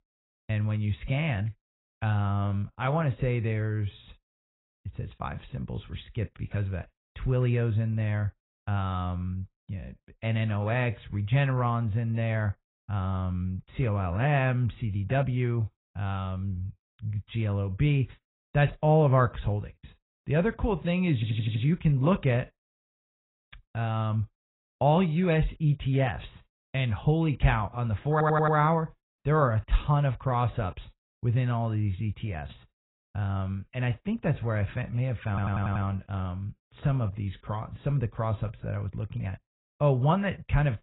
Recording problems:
garbled, watery; badly; nothing above 4 kHz
audio stuttering; at 21 s, at 28 s and at 35 s

